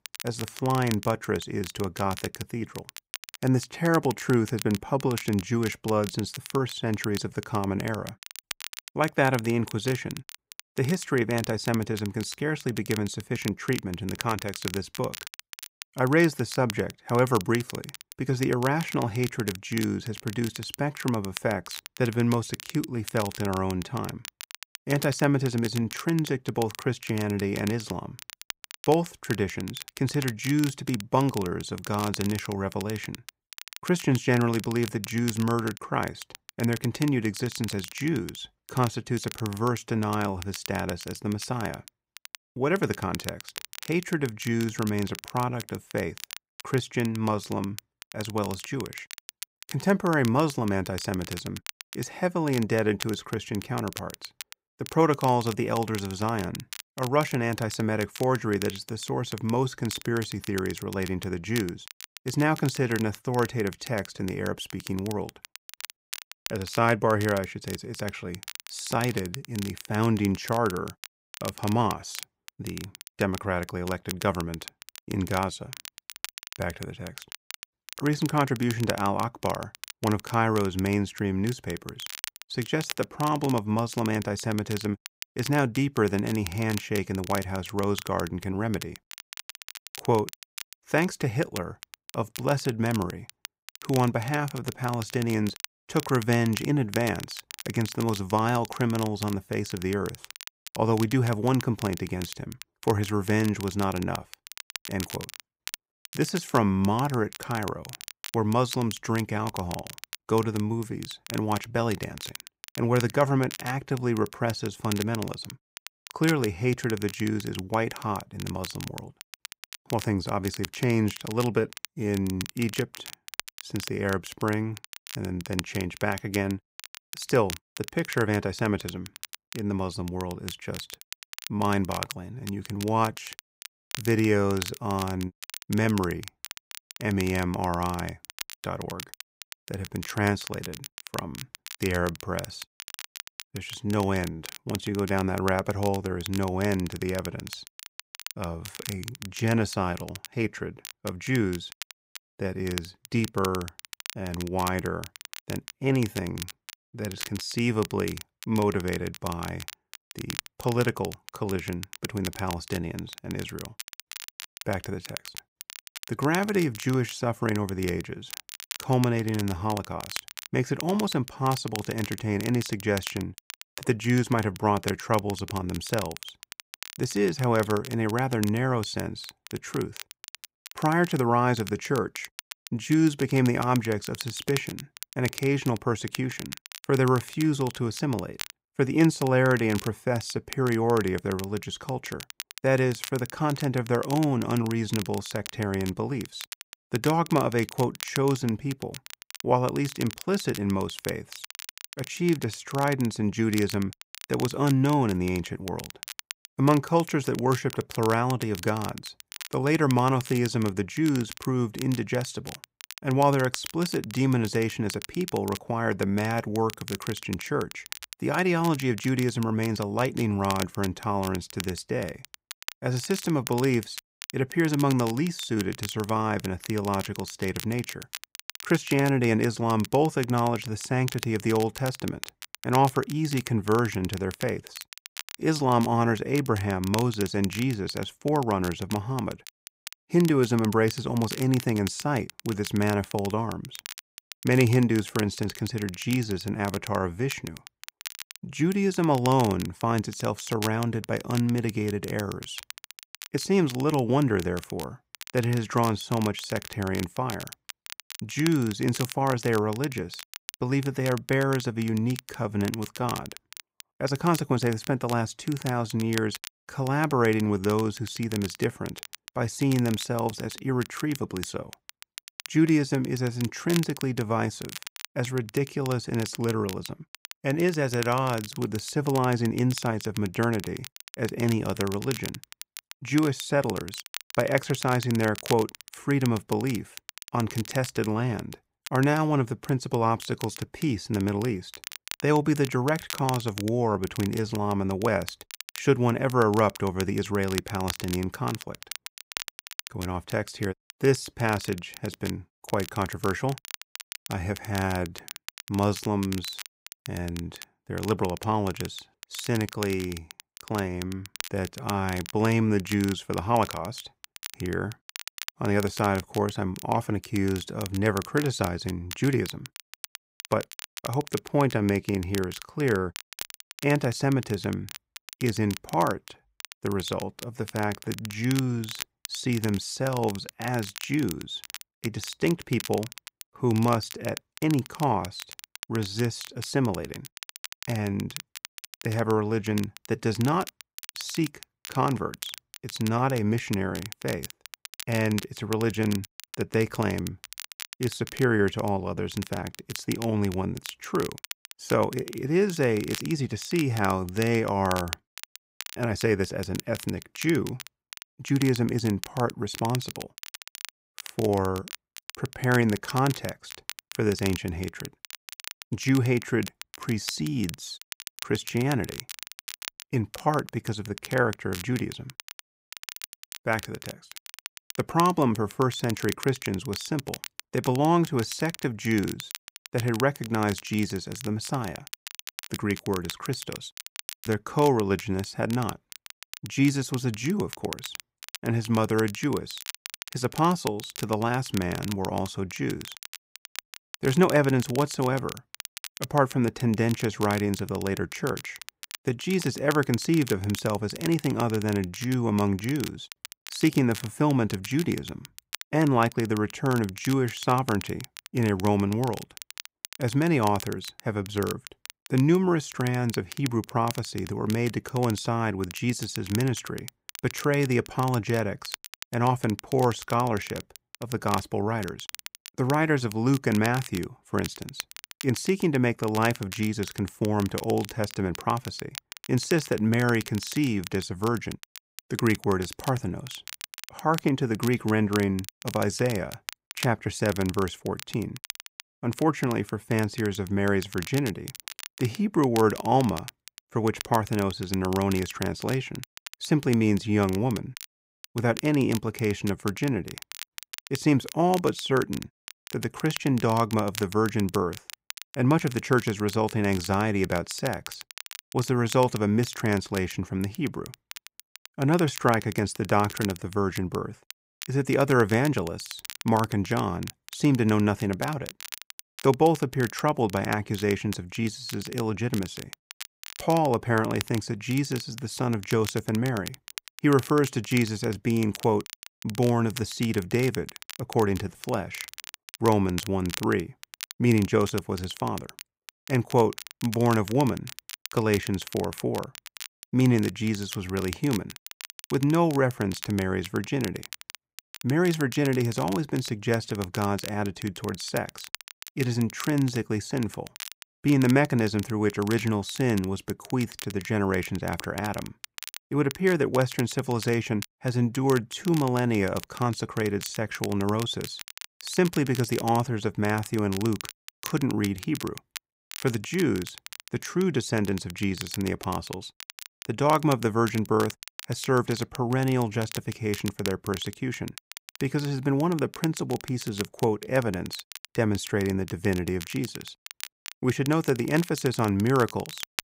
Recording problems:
crackle, like an old record; noticeable; 15 dB below the speech

